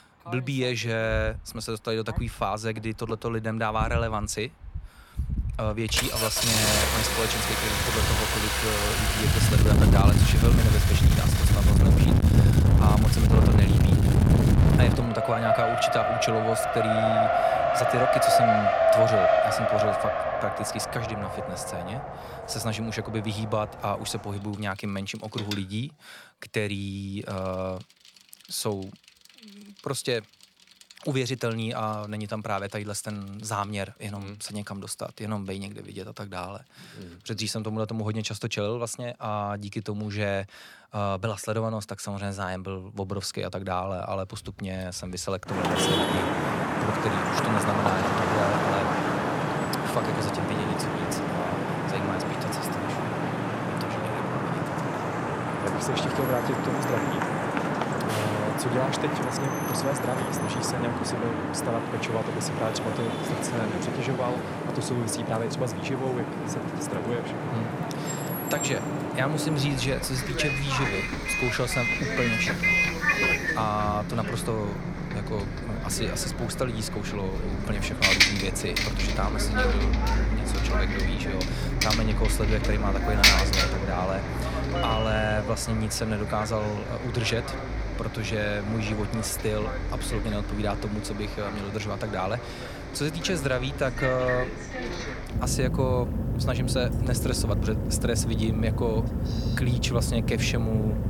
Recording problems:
traffic noise; very loud; throughout; 5 dB above the speech

